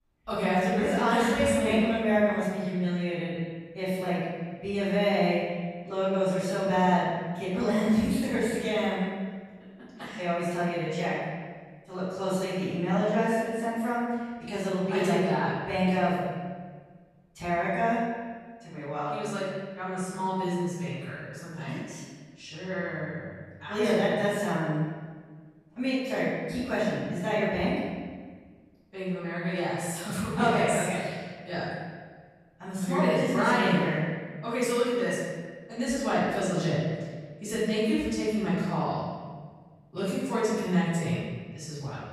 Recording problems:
room echo; strong; dies away in 1.5 s
off-mic speech; far

